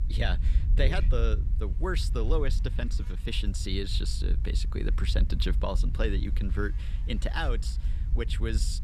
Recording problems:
low rumble; noticeable; throughout; 15 dB below the speech
electrical hum; faint; throughout; 50 Hz, 25 dB below the speech

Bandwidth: 14.5 kHz